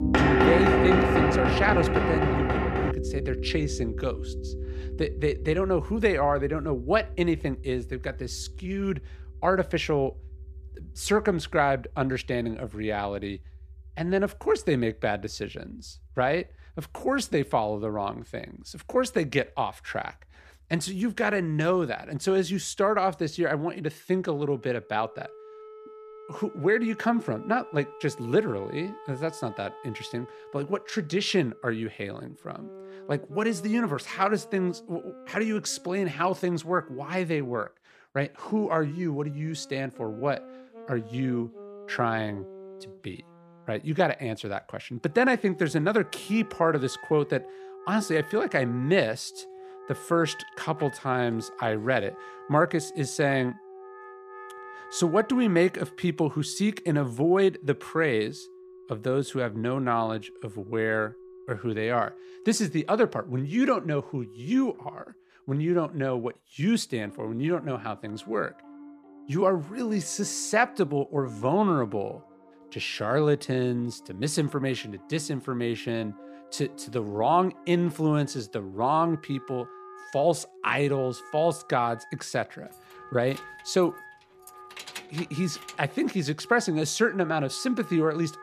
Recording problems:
background music; noticeable; throughout; 10 dB below the speech
door banging; loud; until 3 s; peak 5 dB above the speech
jangling keys; faint; from 1:23 to 1:26; peak 10 dB below the speech

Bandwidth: 14.5 kHz